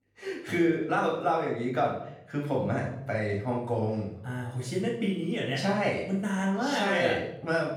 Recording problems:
off-mic speech; far
room echo; noticeable; dies away in 0.6 s

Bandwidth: 18.5 kHz